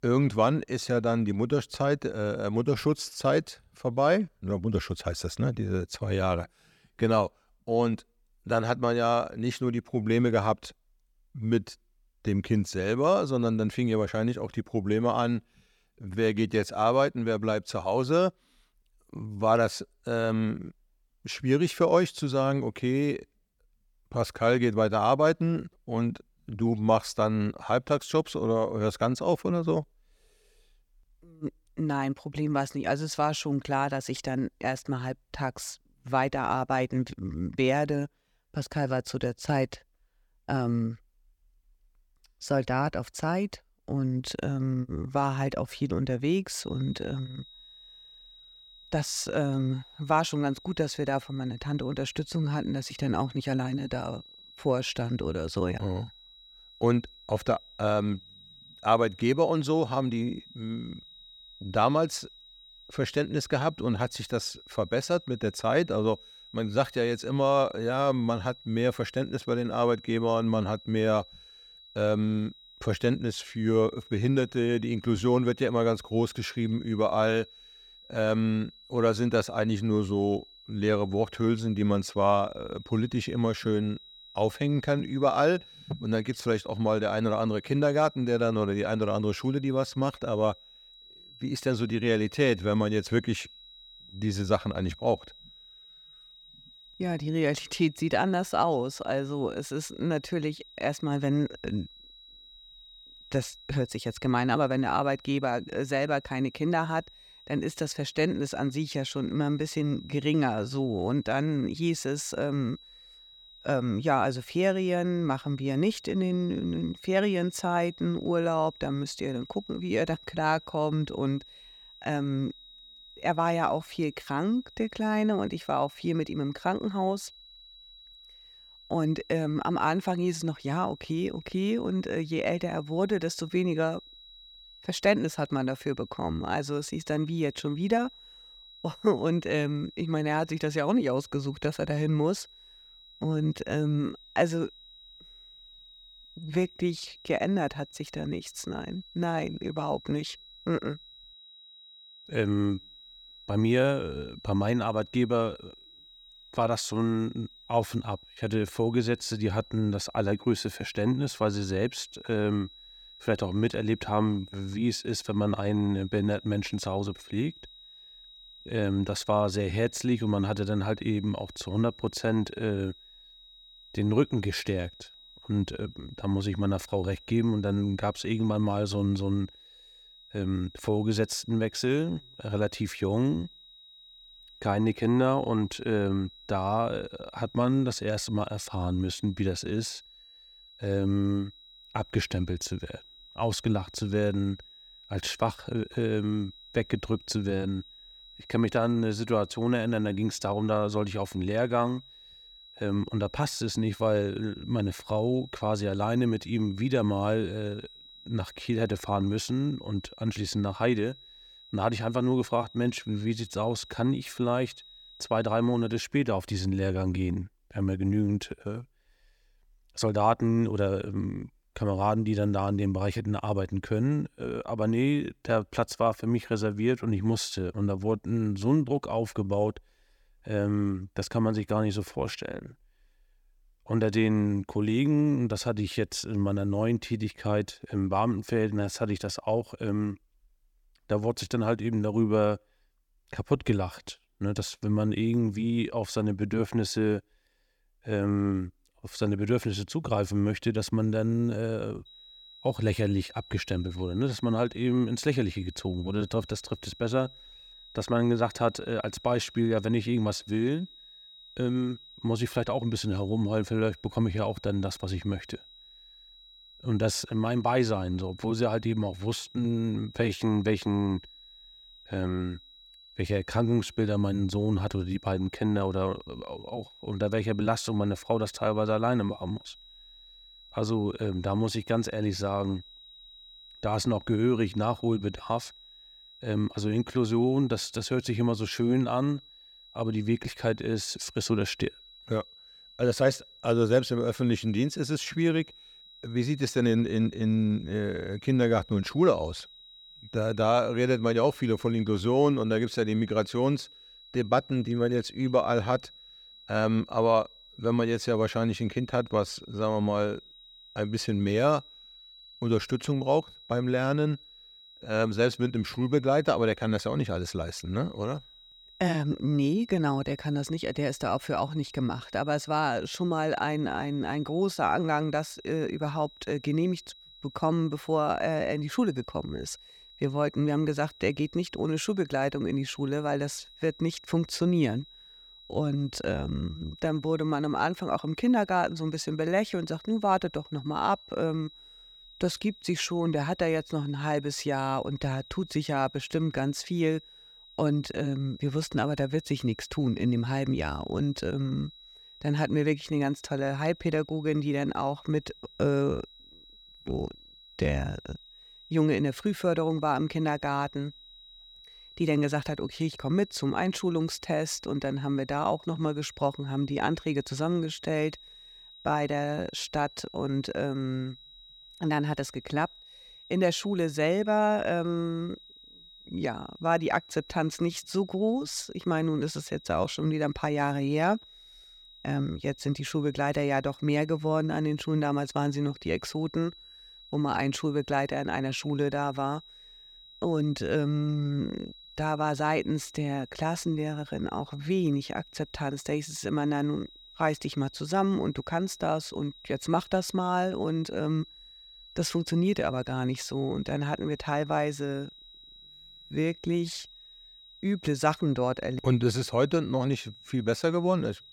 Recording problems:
high-pitched whine; faint; from 47 s to 3:36 and from 4:12 on; 4 kHz, 20 dB below the speech

